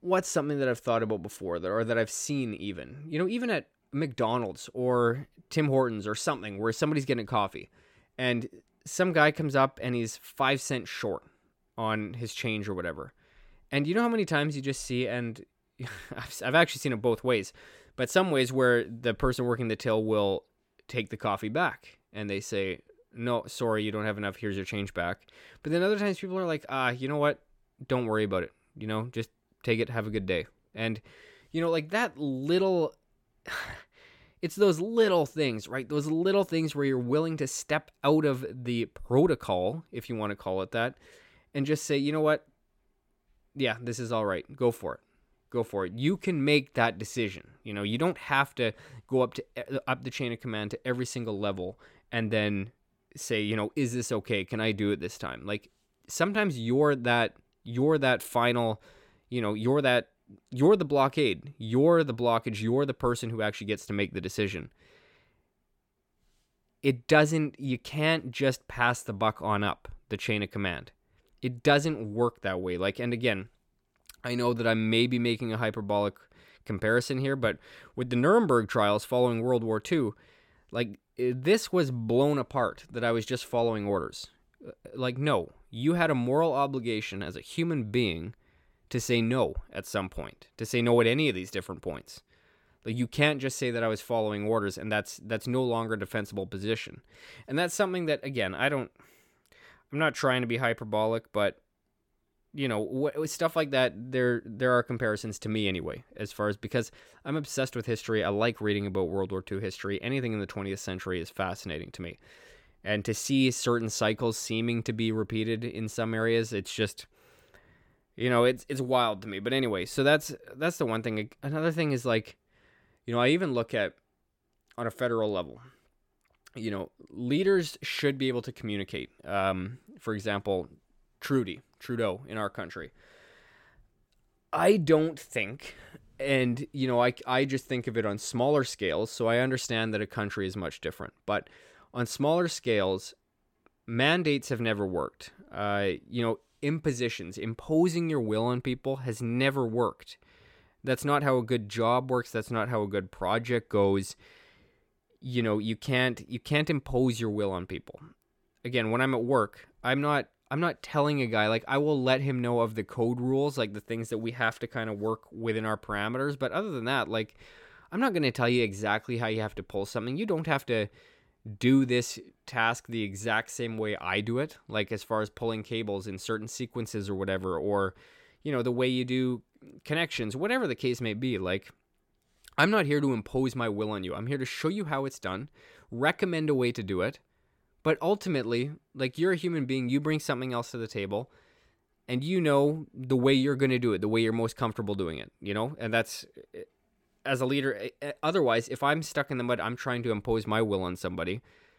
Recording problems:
none

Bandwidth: 17 kHz